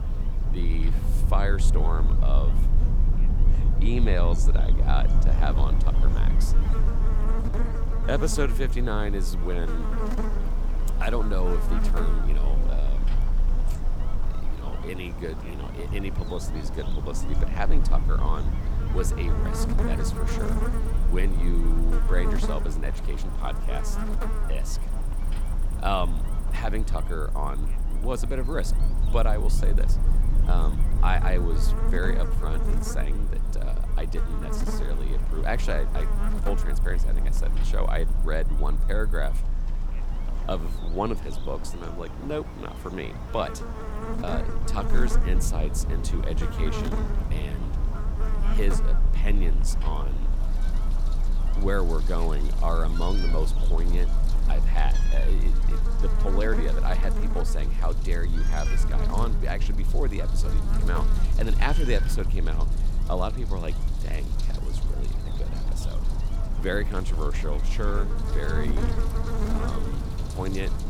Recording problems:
electrical hum; loud; throughout; 60 Hz, 7 dB below the speech
animal sounds; noticeable; throughout; 15 dB below the speech
low rumble; noticeable; throughout; 10 dB below the speech

